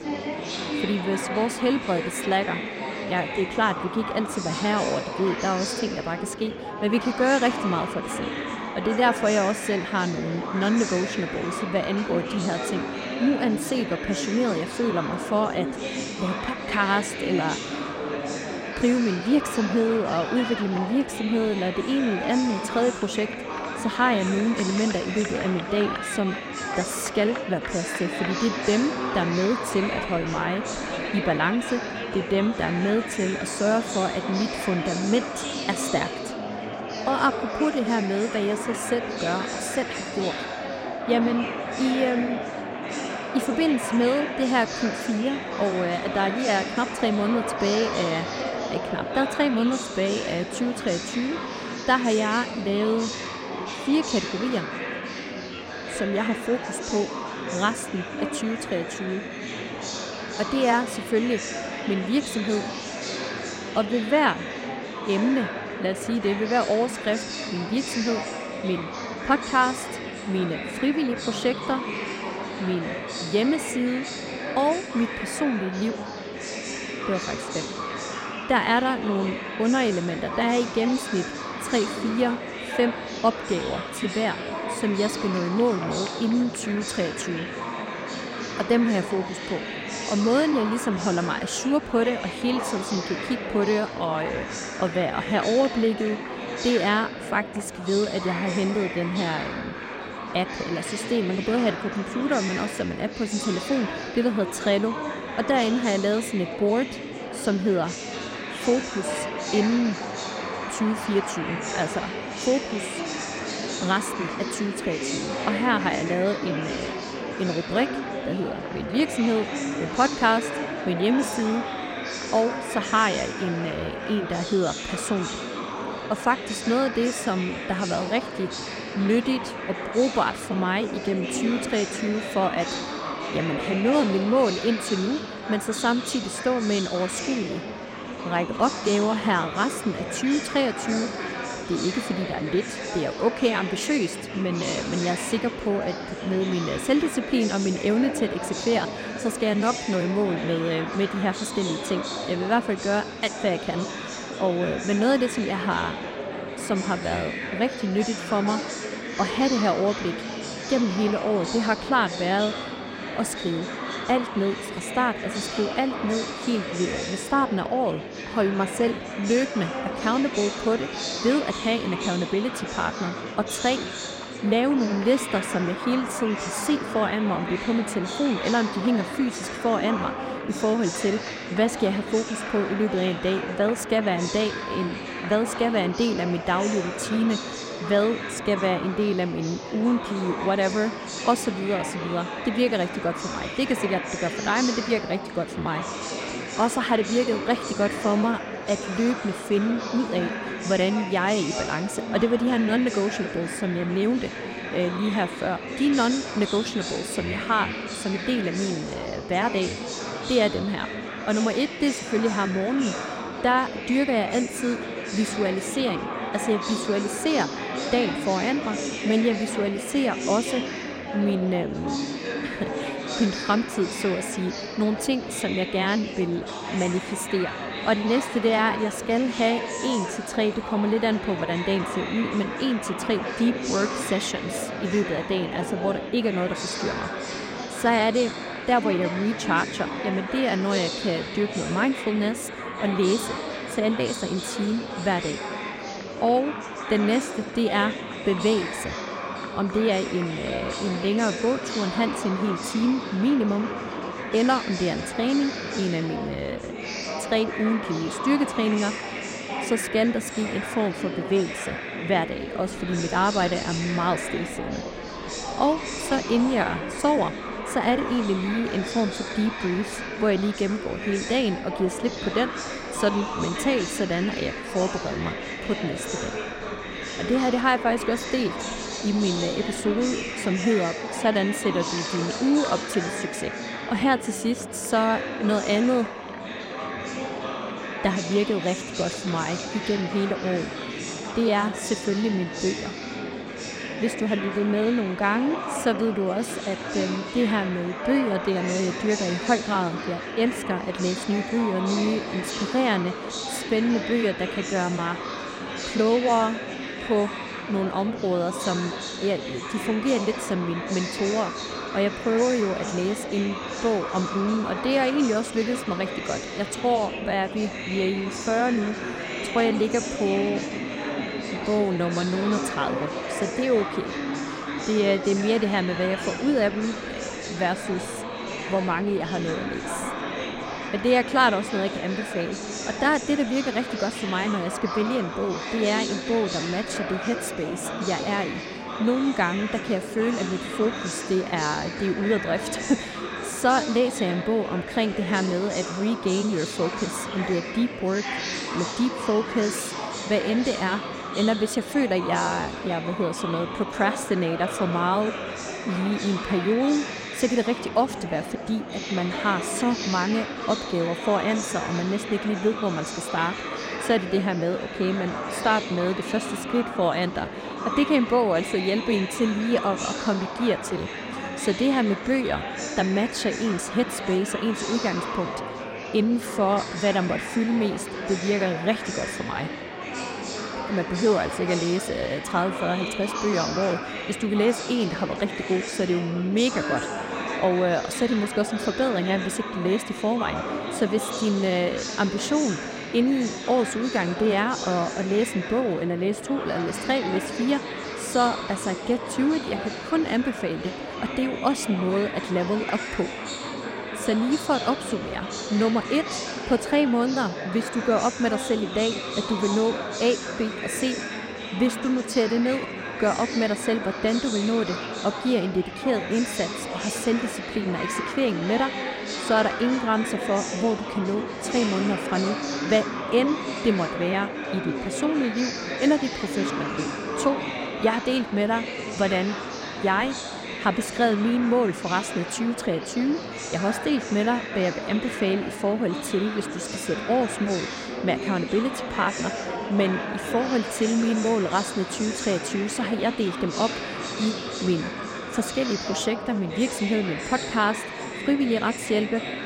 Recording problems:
murmuring crowd; loud; throughout; 5 dB below the speech

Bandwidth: 16 kHz